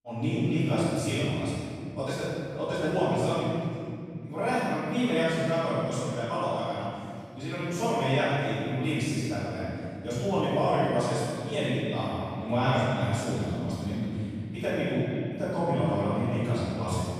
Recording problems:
room echo; strong; dies away in 2.8 s
off-mic speech; far
echo of what is said; noticeable; from 11 s on; 320 ms later, 20 dB below the speech

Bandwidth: 15 kHz